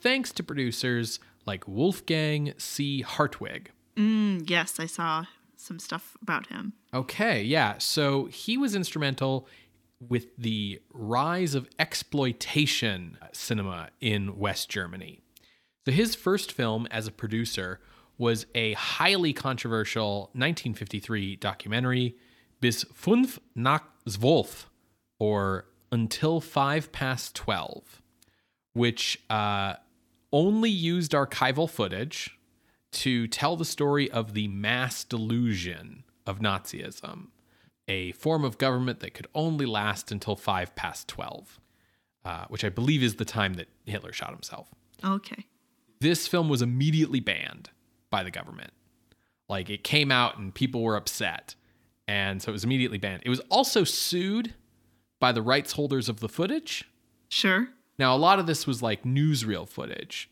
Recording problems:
none

